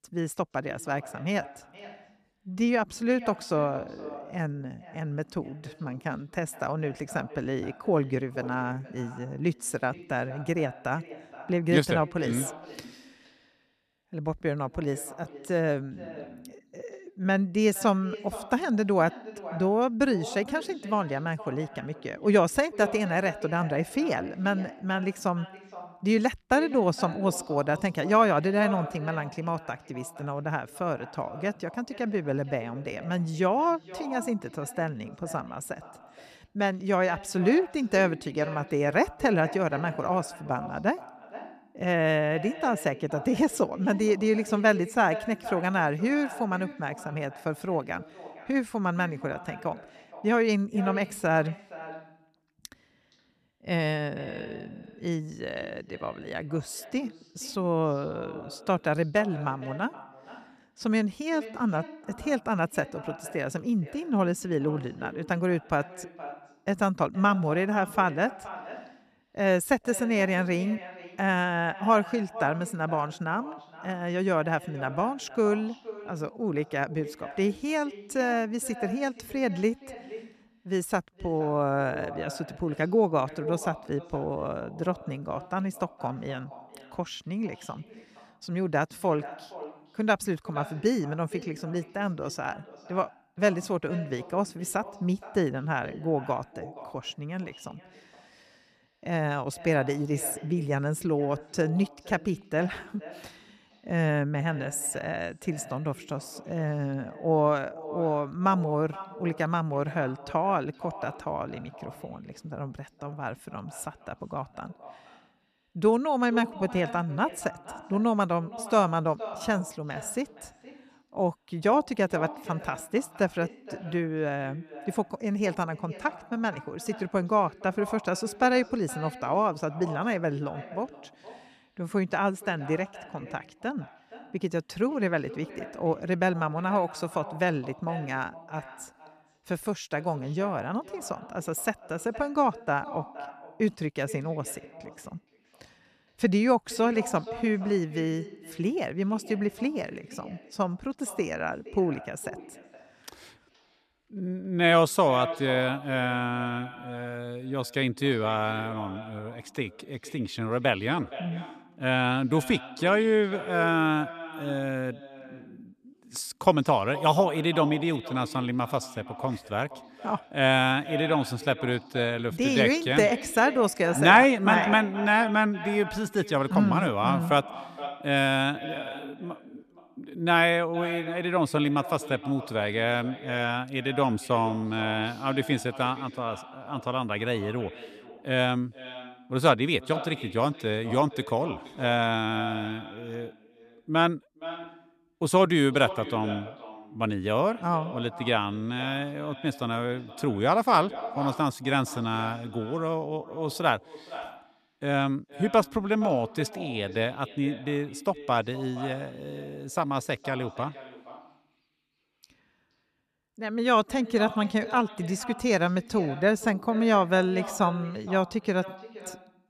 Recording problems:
echo of what is said; noticeable; throughout; 470 ms later, 15 dB below the speech

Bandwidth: 14 kHz